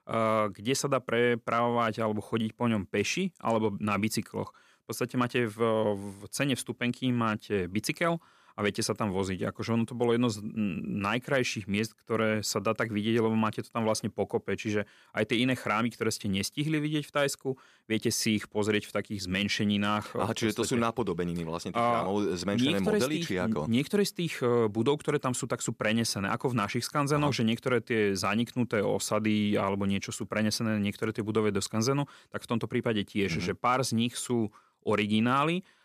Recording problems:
none

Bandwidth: 14.5 kHz